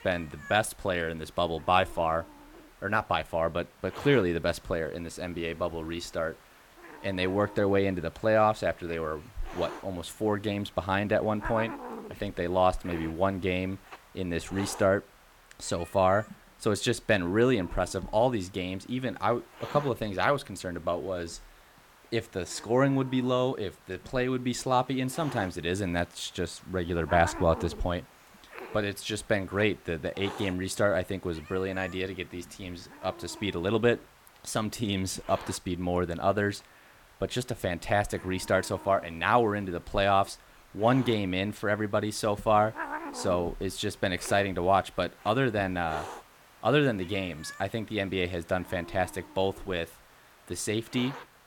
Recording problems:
hiss; noticeable; throughout; 20 dB below the speech

